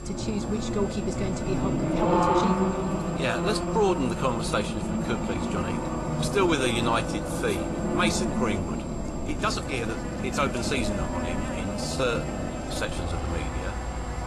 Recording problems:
garbled, watery; slightly
electrical hum; loud; throughout; 50 Hz, 10 dB below the speech
traffic noise; loud; throughout; as loud as the speech
high-pitched whine; noticeable; throughout; 7.5 kHz, 20 dB below the speech
uneven, jittery; strongly; from 1 to 13 s

